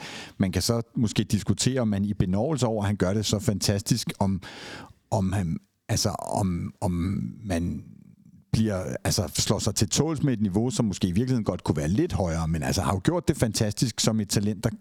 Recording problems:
squashed, flat; heavily

